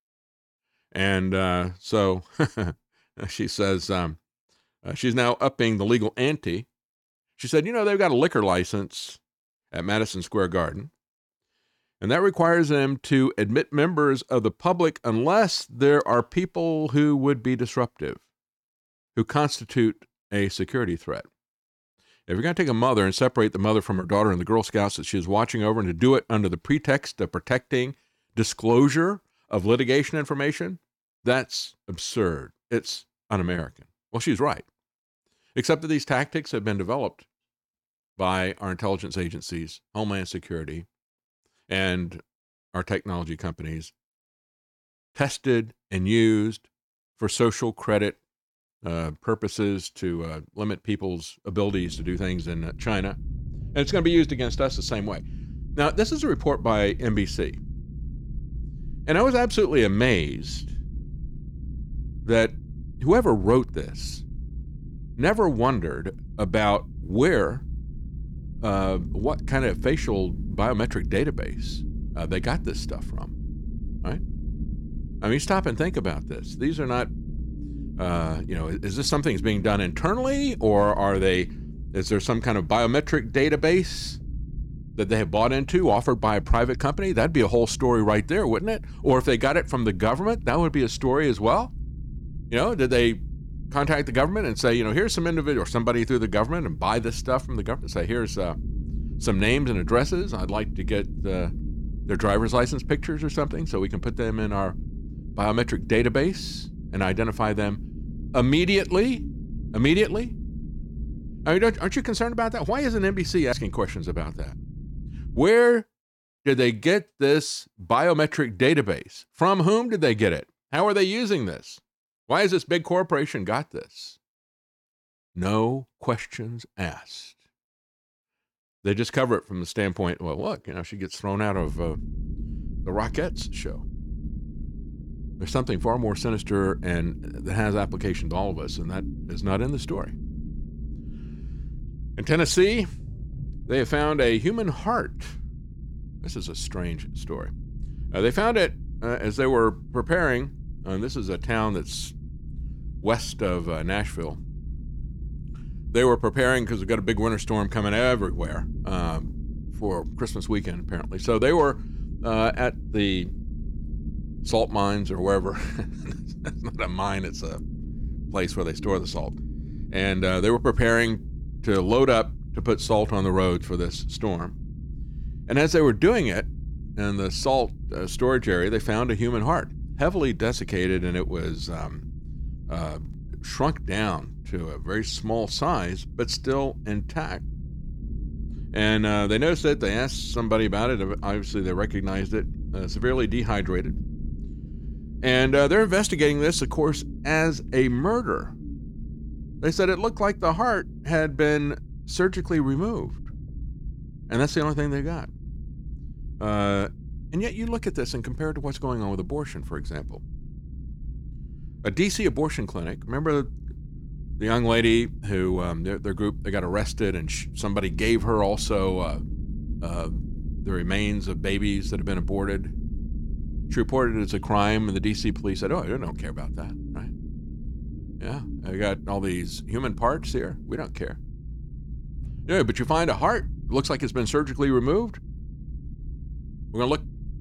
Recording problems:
low rumble; faint; from 52 s to 1:55 and from 2:12 on; 25 dB below the speech

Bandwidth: 17 kHz